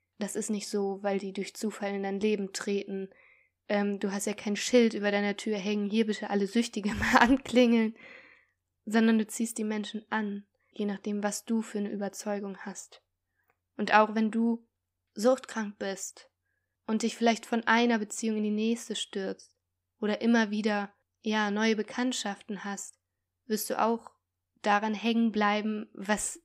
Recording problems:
none

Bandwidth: 15.5 kHz